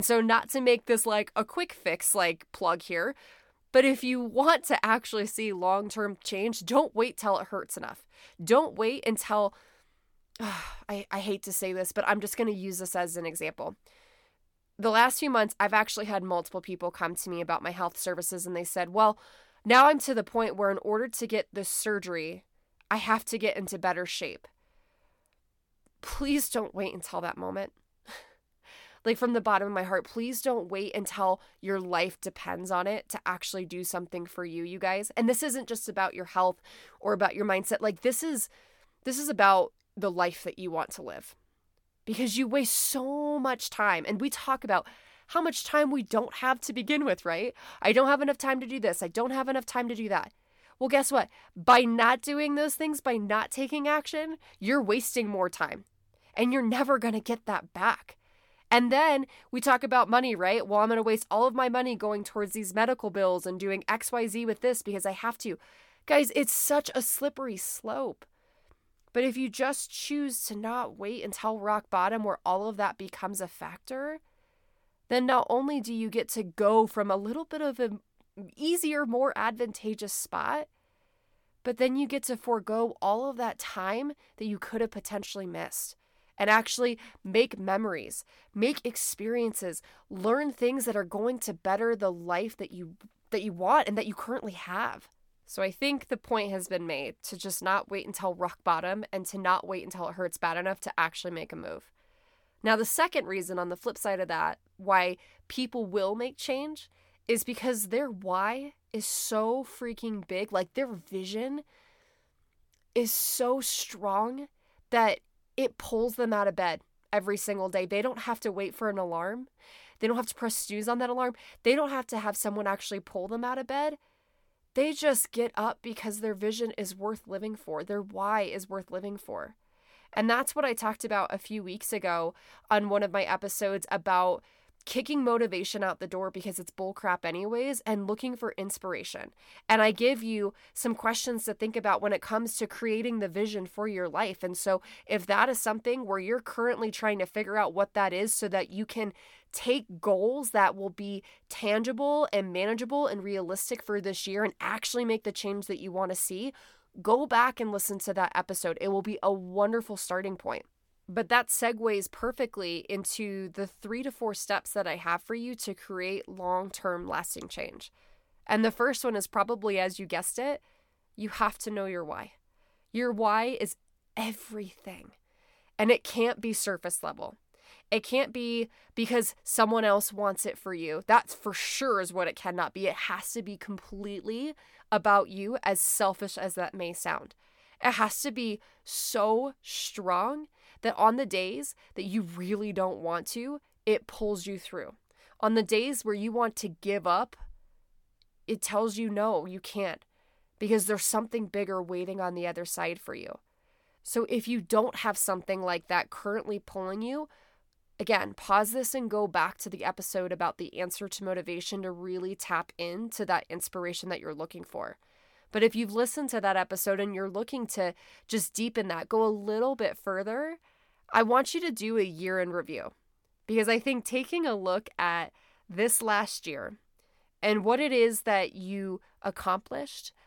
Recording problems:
abrupt cut into speech; at the start

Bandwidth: 17.5 kHz